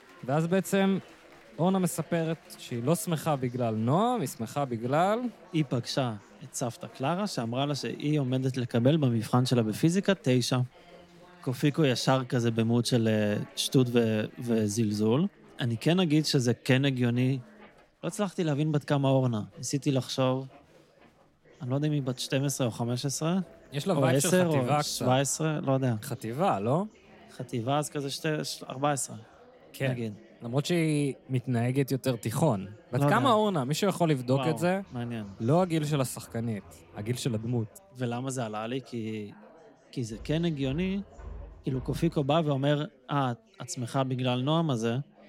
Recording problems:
machinery noise; faint; throughout; 30 dB below the speech
chatter from many people; faint; throughout; 25 dB below the speech

